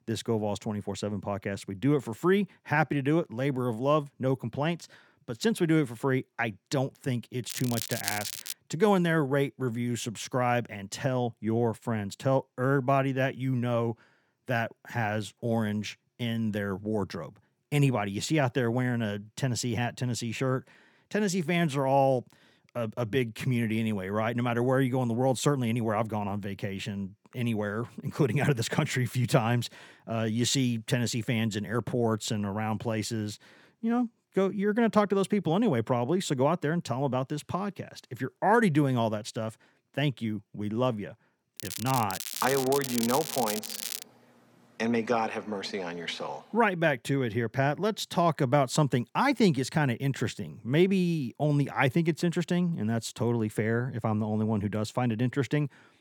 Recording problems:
crackling; loud; from 7.5 to 8.5 s and from 42 to 44 s; 6 dB below the speech

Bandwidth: 18.5 kHz